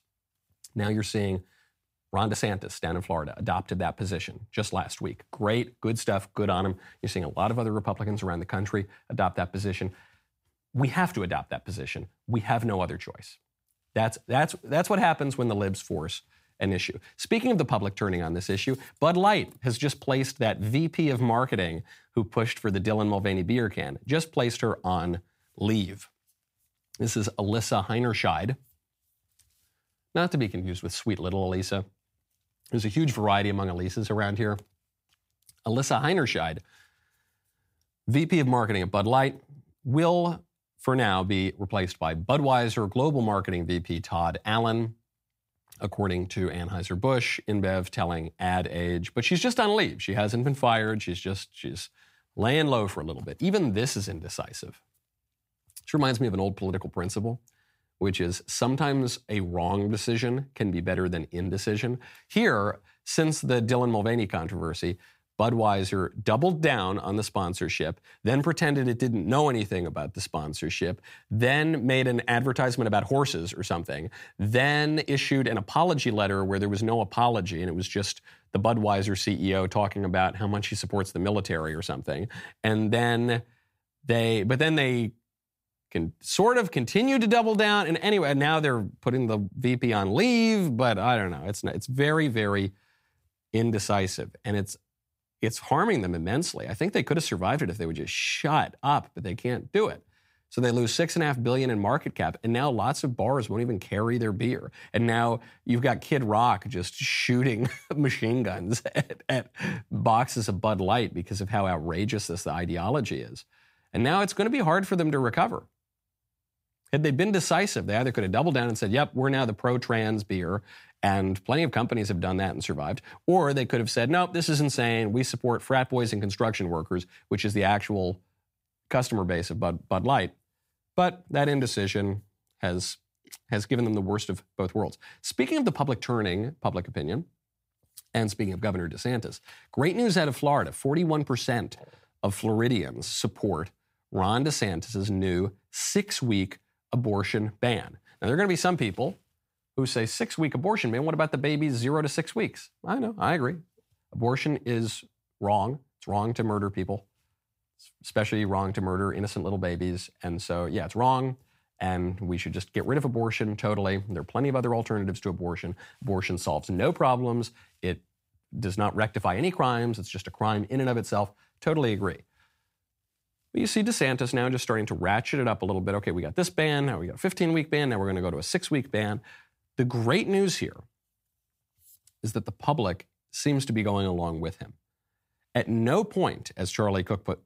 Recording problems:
none

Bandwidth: 15.5 kHz